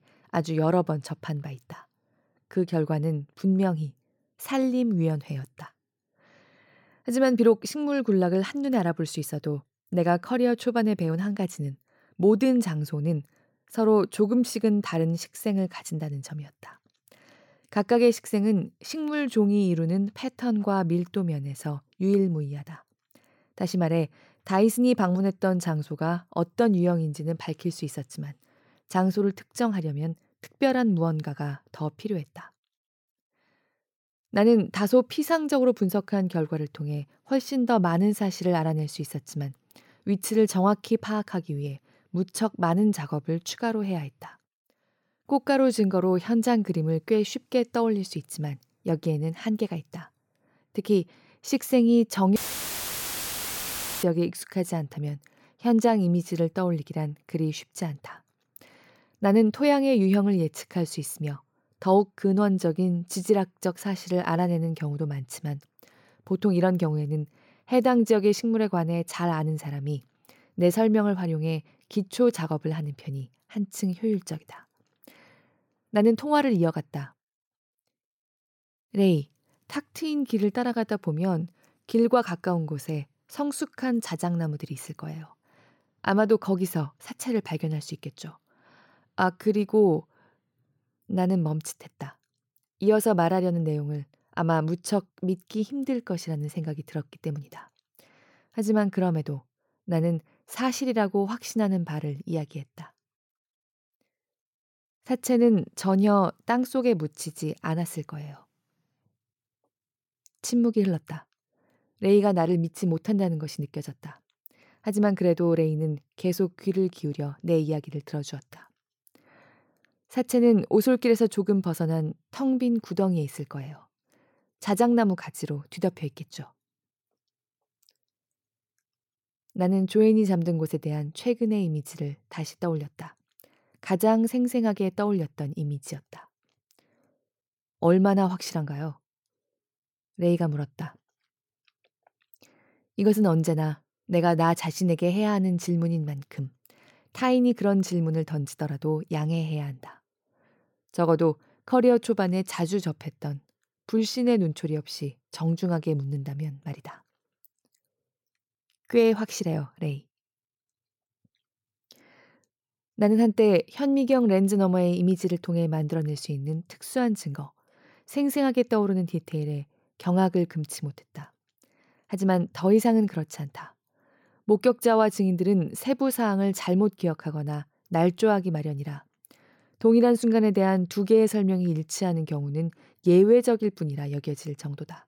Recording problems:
audio cutting out; filled with static; at 52 s for 1.5 s

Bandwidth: 17 kHz